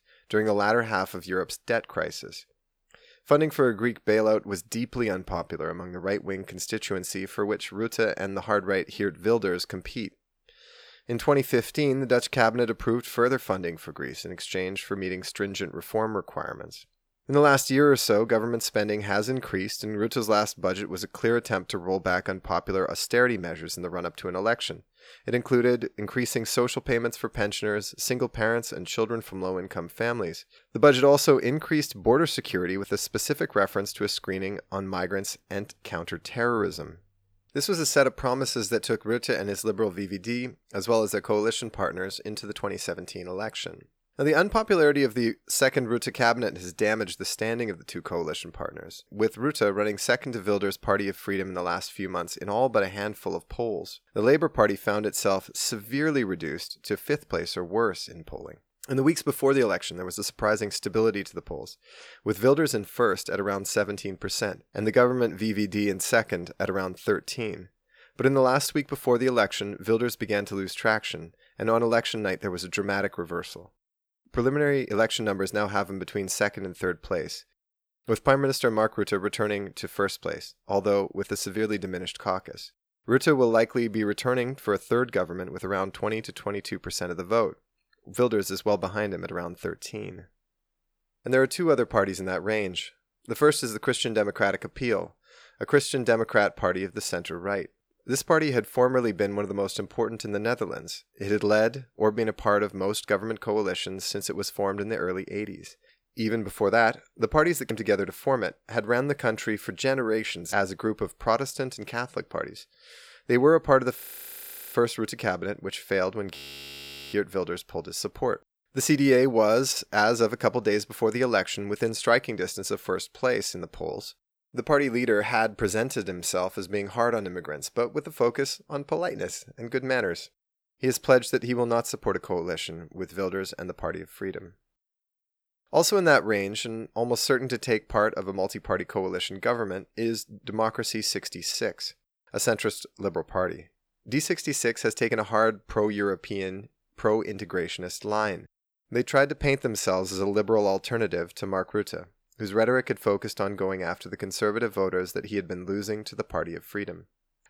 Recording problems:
audio freezing; at 1:54 for 0.5 s and at 1:56 for 1 s

